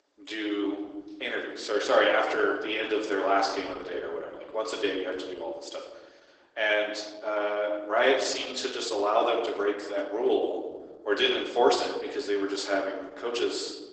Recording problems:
garbled, watery; badly; nothing above 8 kHz
thin; somewhat; fading below 300 Hz
room echo; slight; dies away in 0.9 s
off-mic speech; somewhat distant

